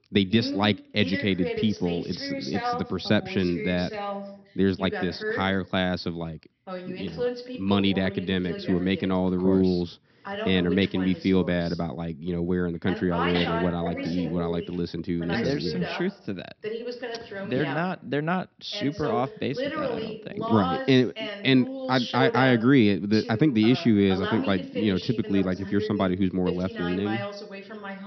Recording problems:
high frequencies cut off; noticeable; nothing above 5.5 kHz
voice in the background; loud; throughout; 8 dB below the speech

